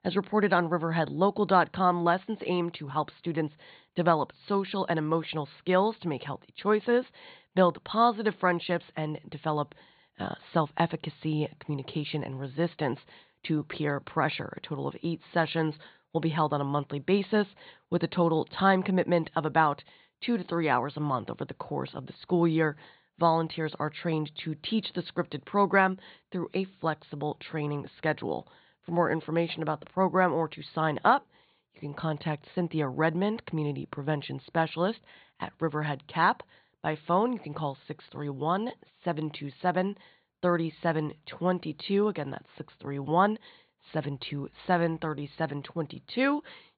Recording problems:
high frequencies cut off; severe; nothing above 4.5 kHz

